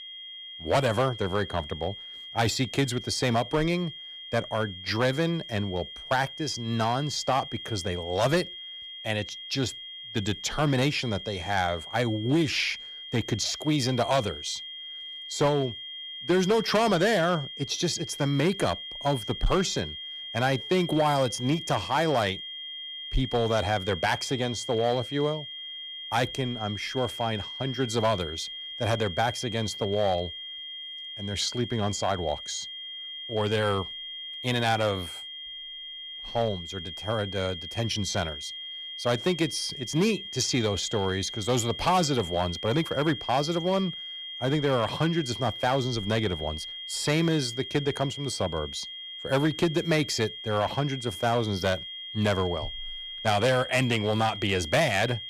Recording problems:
distortion; slight; 3% of the sound clipped
high-pitched whine; loud; throughout; 3 kHz, 9 dB below the speech

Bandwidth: 14.5 kHz